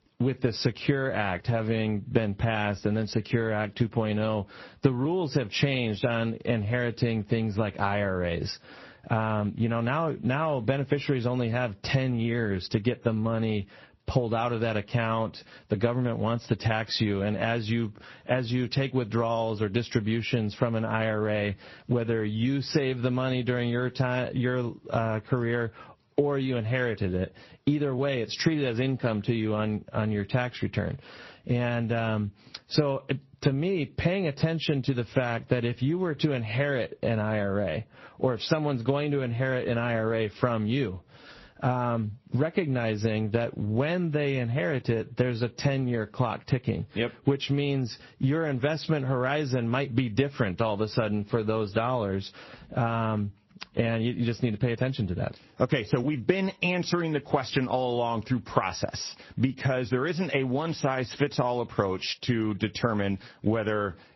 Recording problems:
garbled, watery; slightly; nothing above 5.5 kHz
squashed, flat; somewhat

